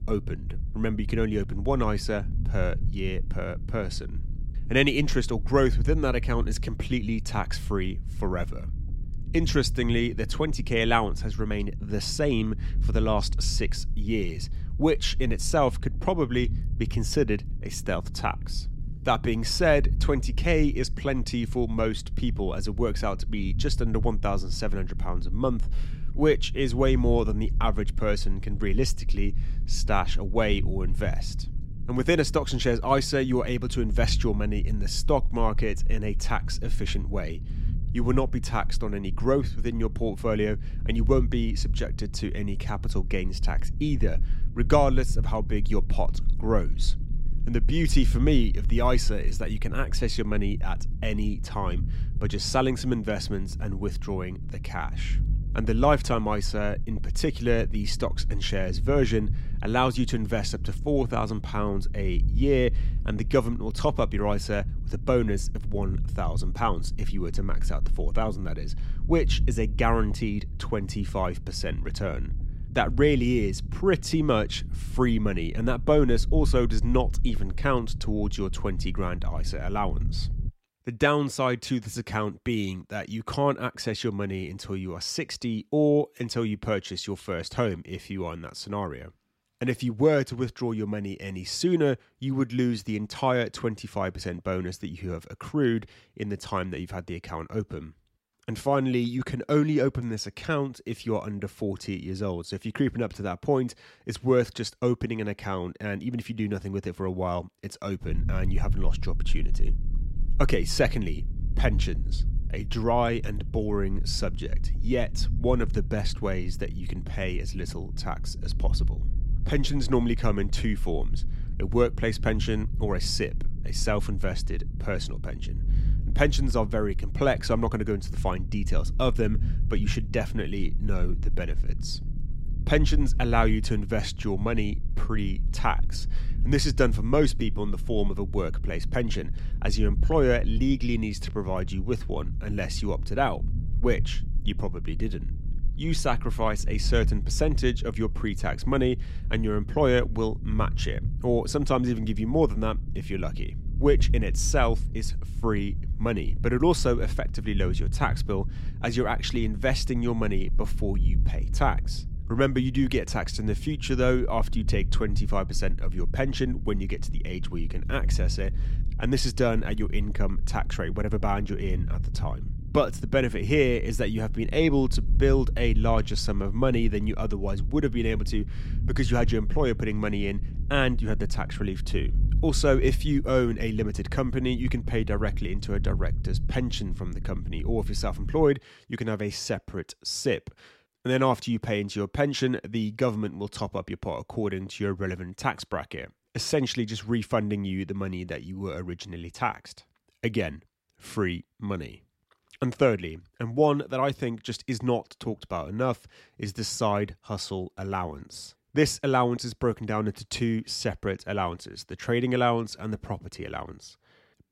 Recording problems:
low rumble; noticeable; until 1:20 and from 1:48 to 3:08; 20 dB below the speech

